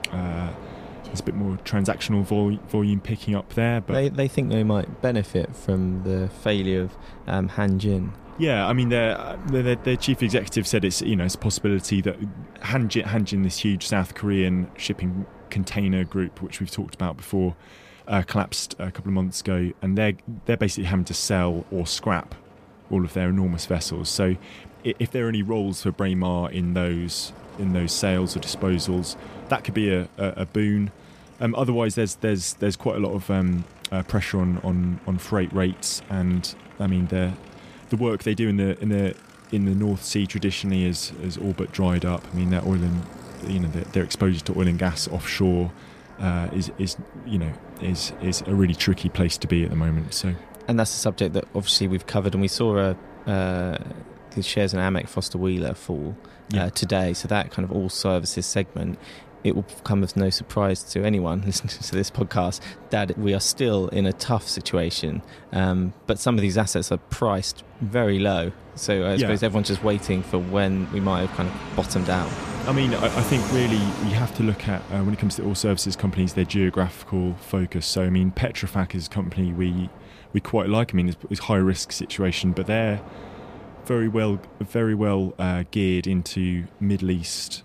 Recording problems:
train or aircraft noise; noticeable; throughout; 15 dB below the speech

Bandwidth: 14.5 kHz